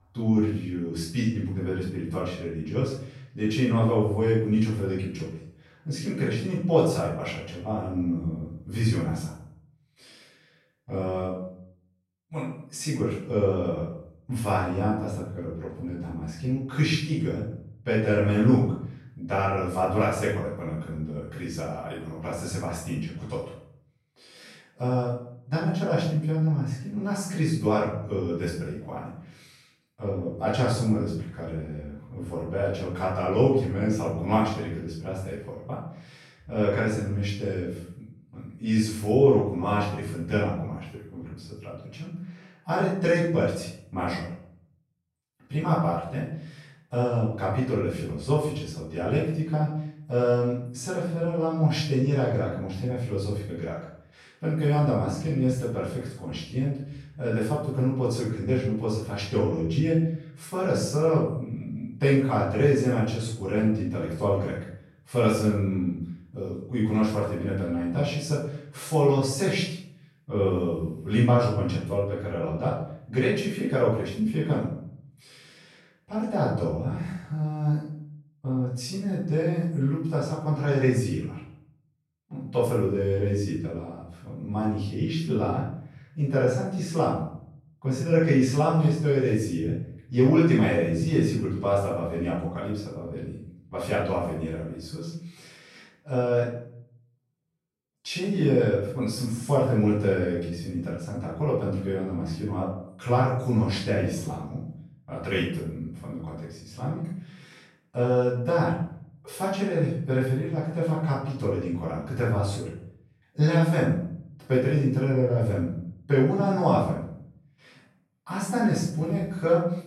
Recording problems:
off-mic speech; far
room echo; noticeable; dies away in 0.6 s

